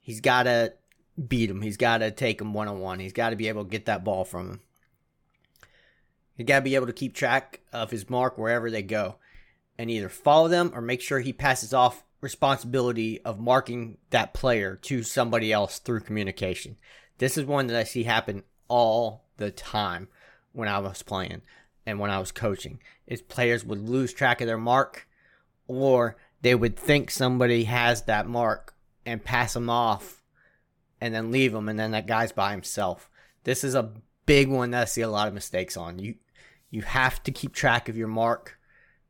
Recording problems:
none

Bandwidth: 17.5 kHz